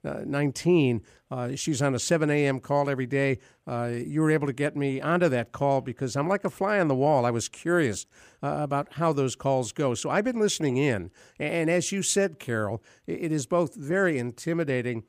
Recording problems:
none

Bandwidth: 15 kHz